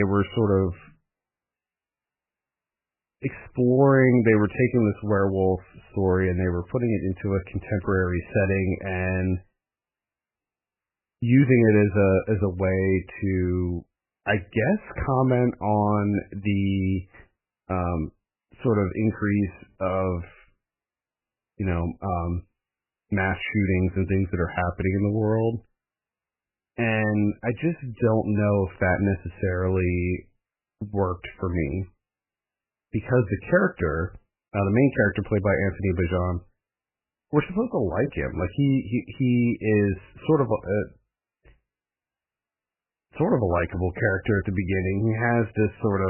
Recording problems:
garbled, watery; badly; nothing above 3 kHz
abrupt cut into speech; at the start and the end

